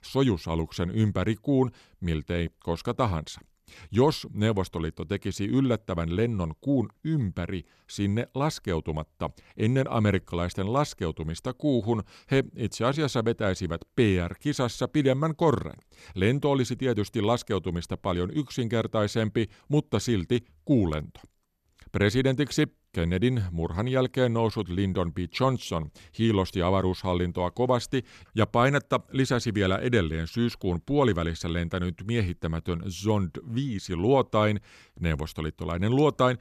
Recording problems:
none

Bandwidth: 14 kHz